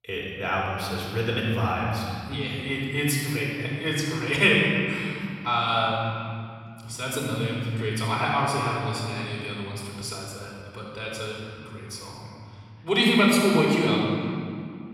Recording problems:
room echo; strong; dies away in 2.3 s
off-mic speech; far

